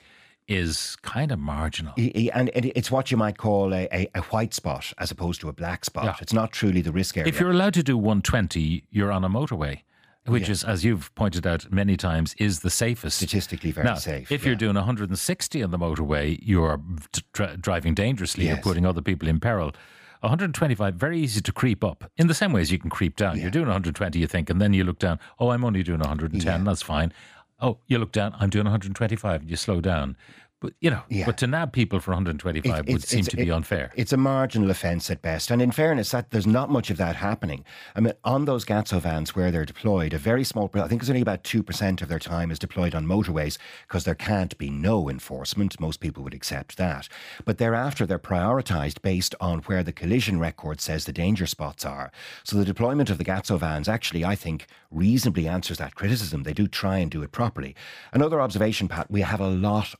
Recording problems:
none

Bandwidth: 15 kHz